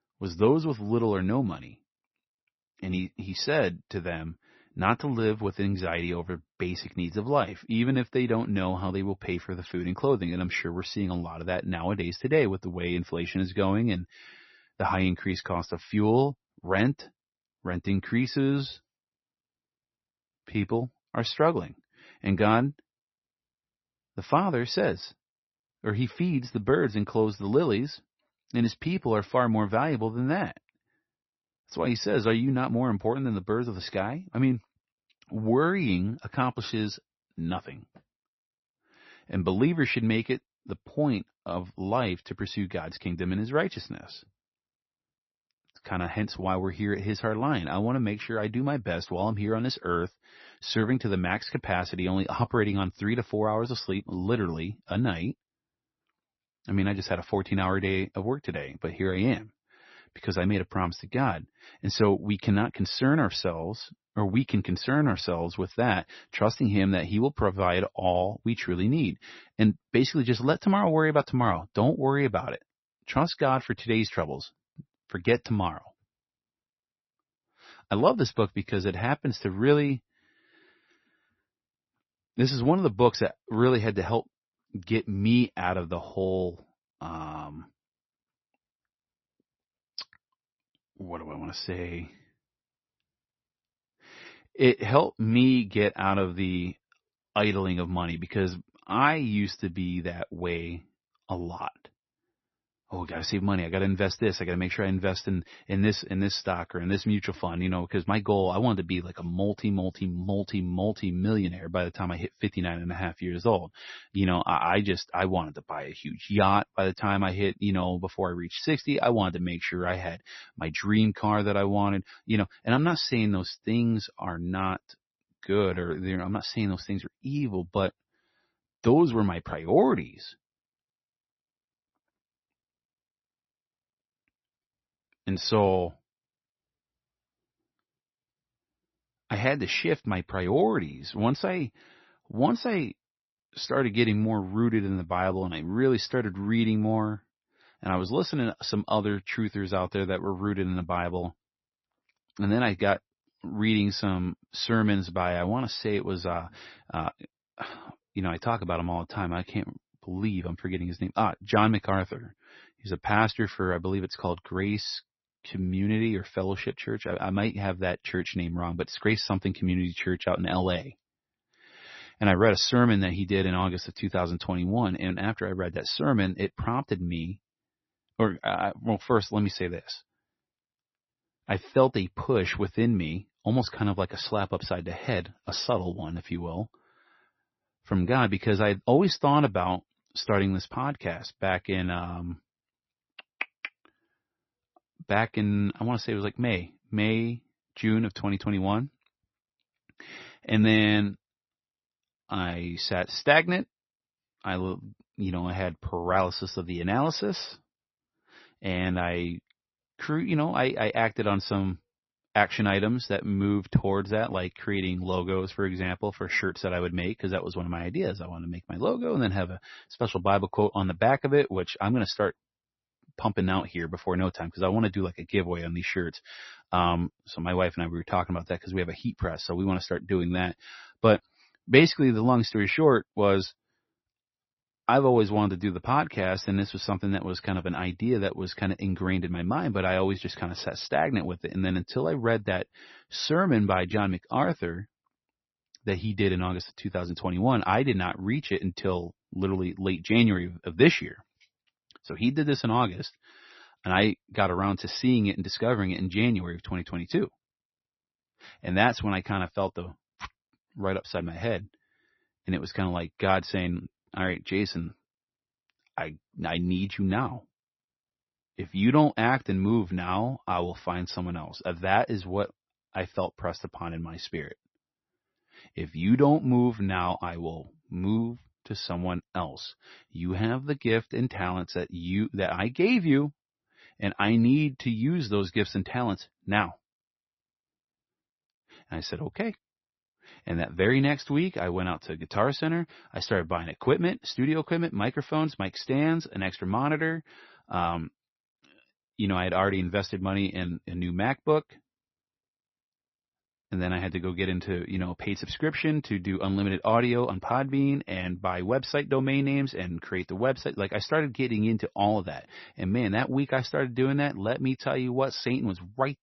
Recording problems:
garbled, watery; slightly; nothing above 6 kHz

